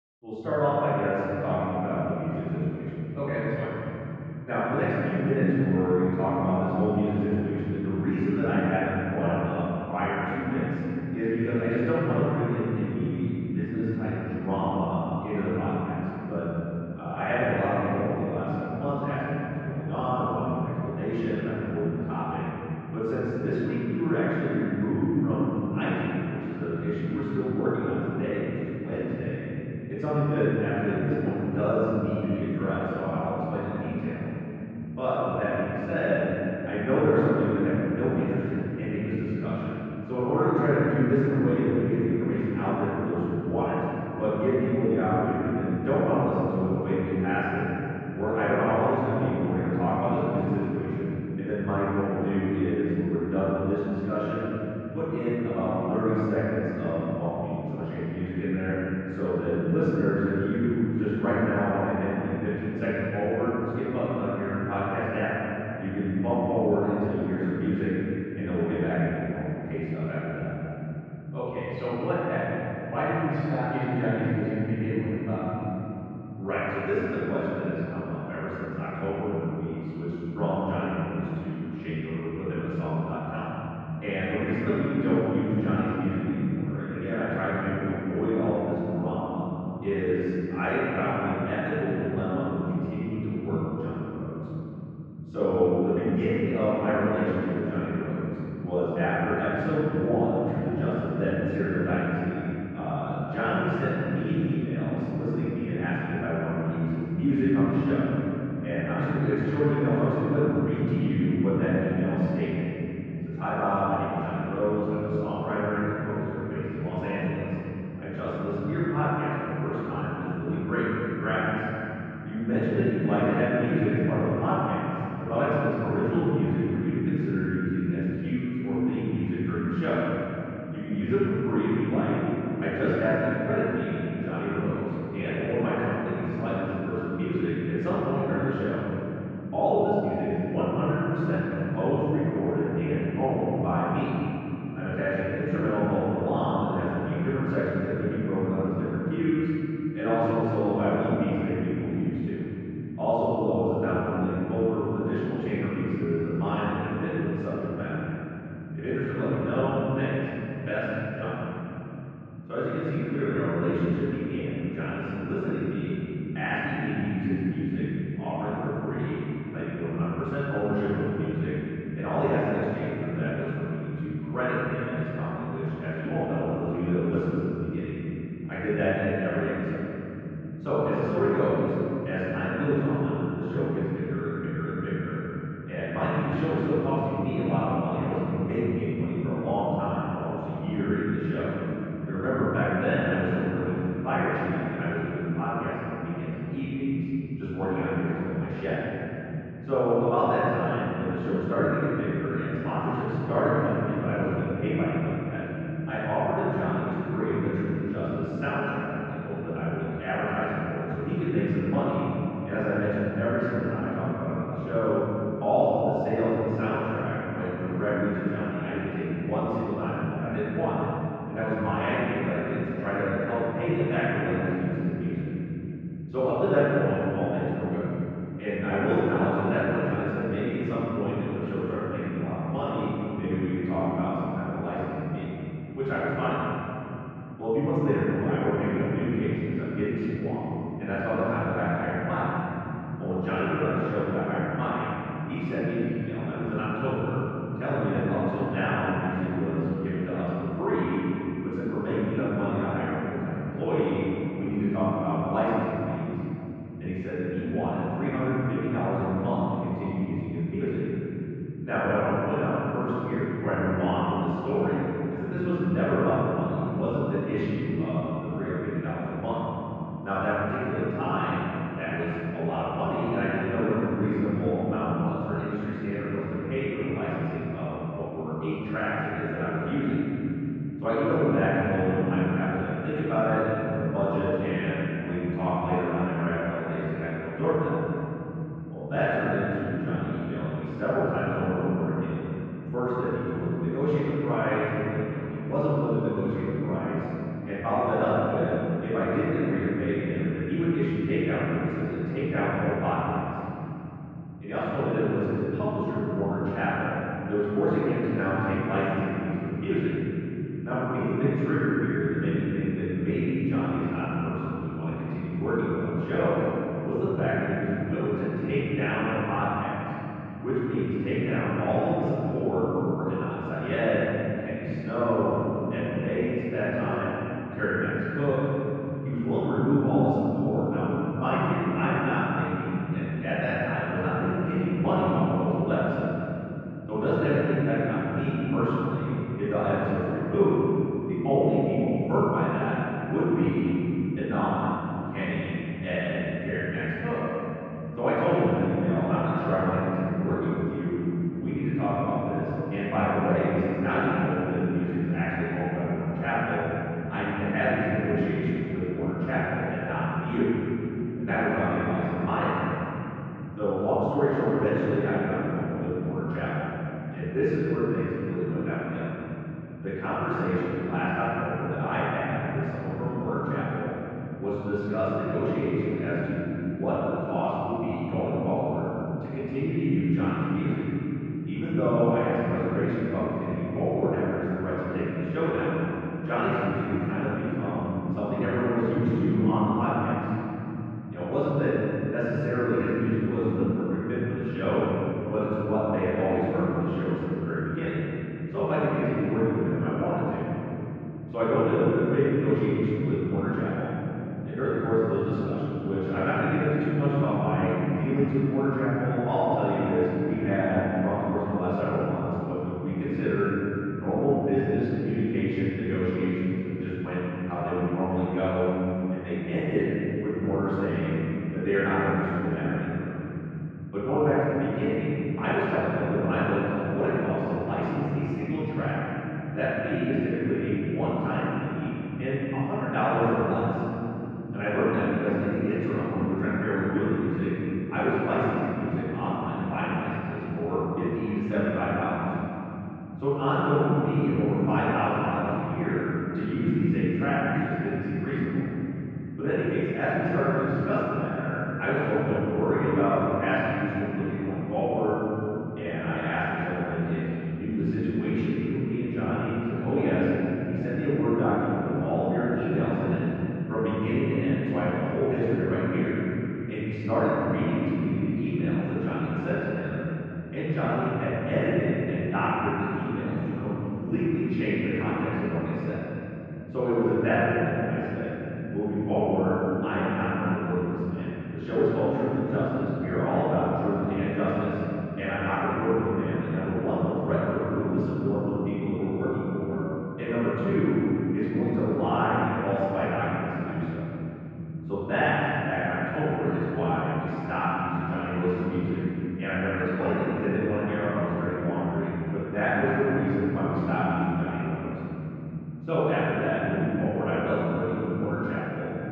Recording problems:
room echo; strong; dies away in 3 s
off-mic speech; far
muffled; very; fading above 2 kHz

